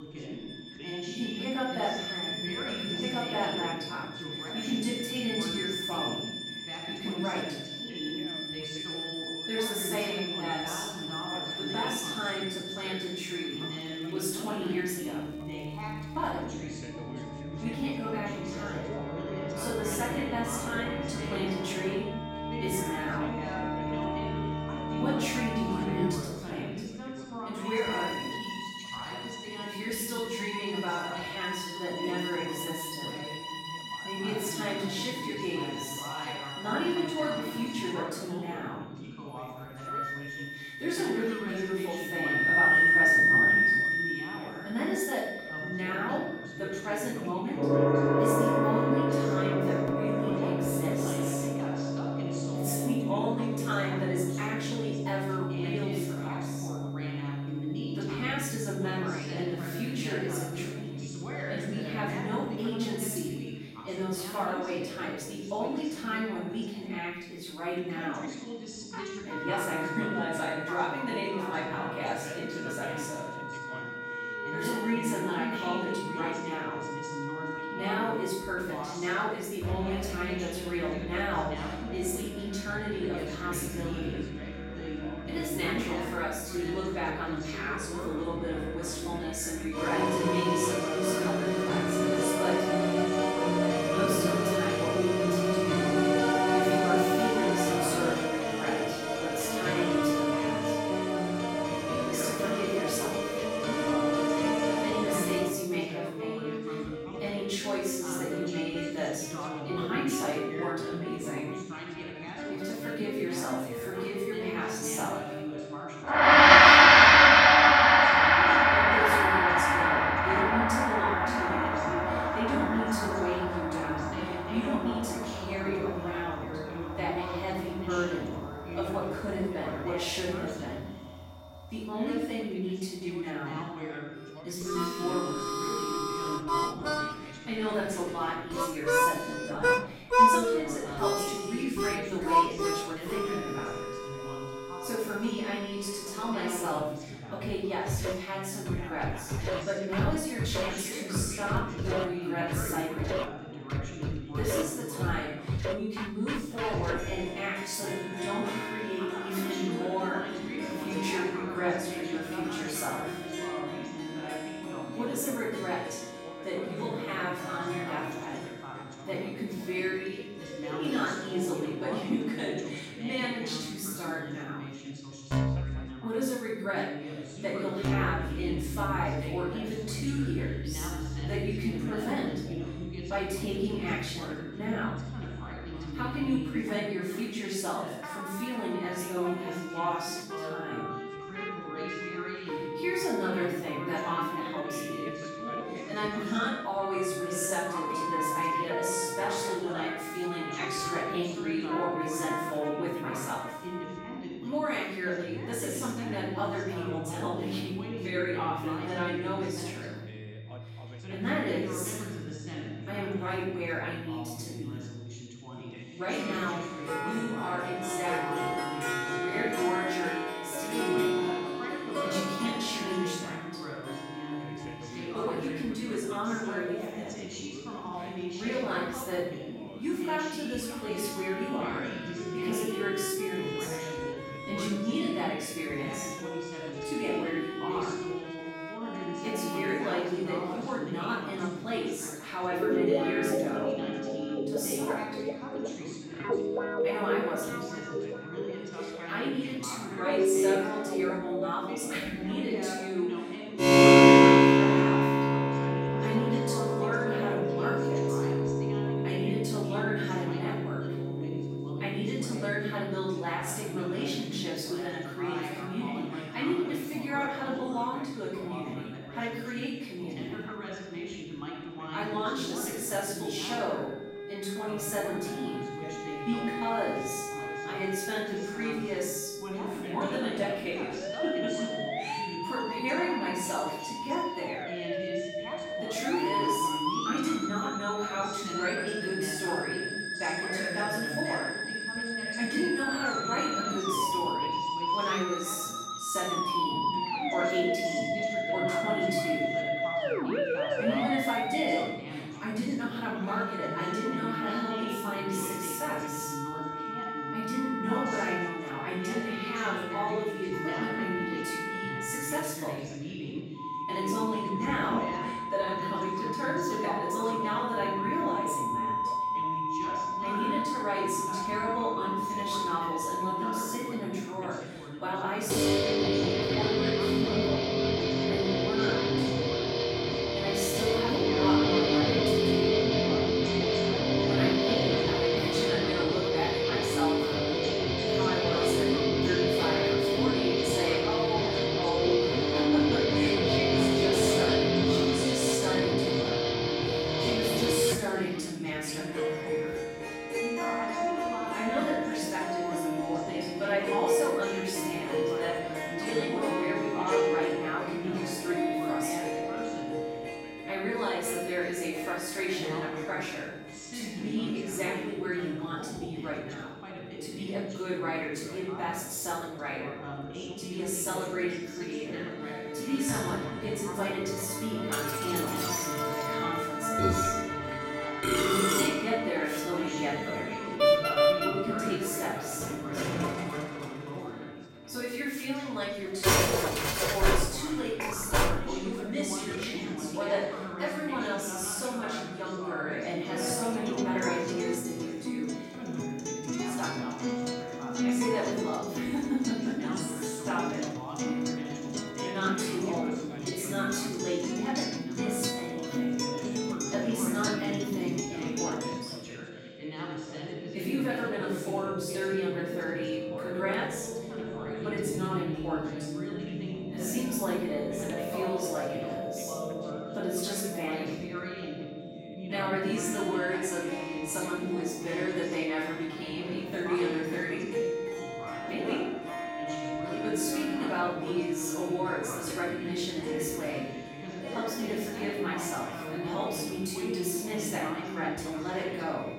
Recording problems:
off-mic speech; far
room echo; noticeable; dies away in 0.7 s
background music; very loud; throughout; 4 dB above the speech
background chatter; loud; throughout; 2 voices, 6 dB below the speech
high-pitched whine; faint; throughout; 3.5 kHz, 25 dB below the speech
crackling; very faint; from 14 to 16 s and at 3:22; 30 dB below the speech

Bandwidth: 16 kHz